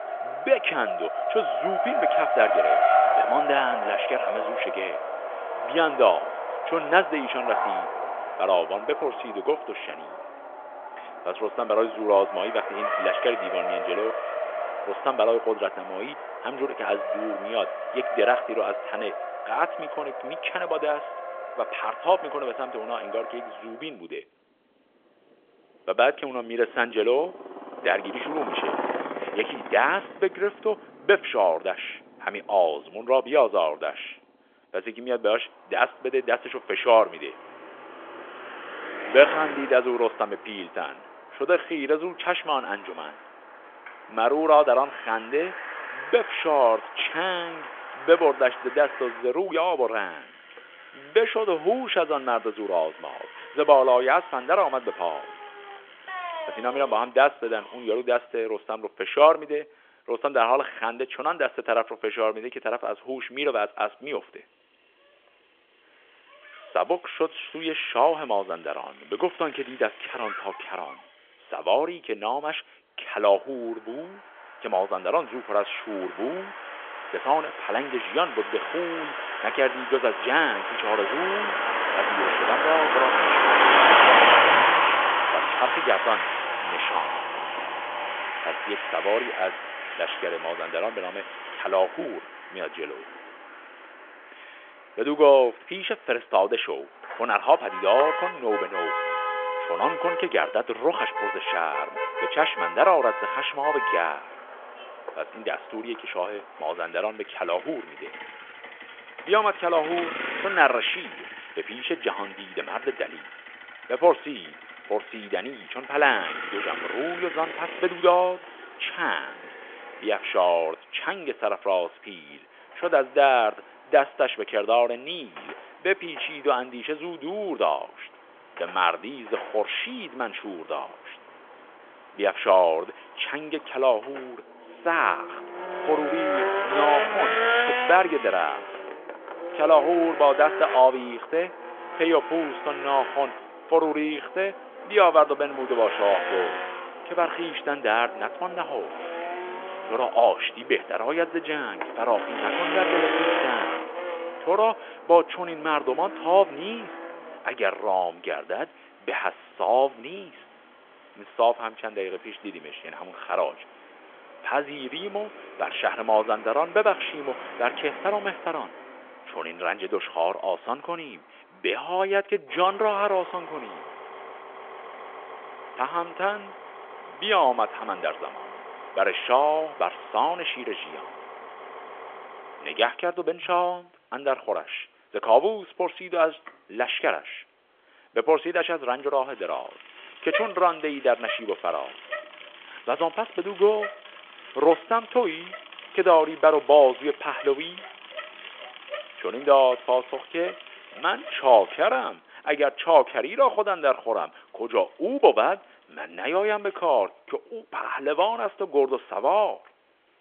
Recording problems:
phone-call audio; nothing above 3.5 kHz
traffic noise; loud; throughout; 3 dB below the speech

